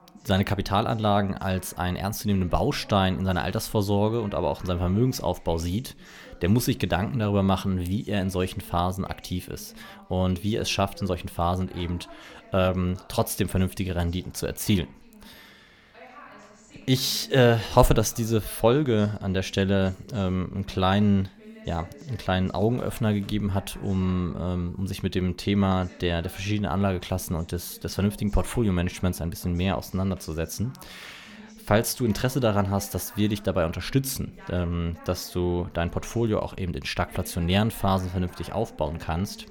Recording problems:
voice in the background; faint; throughout; 25 dB below the speech

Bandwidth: 18 kHz